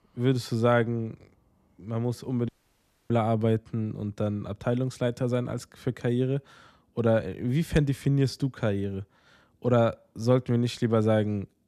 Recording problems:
audio cutting out; at 2.5 s for 0.5 s

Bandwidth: 14.5 kHz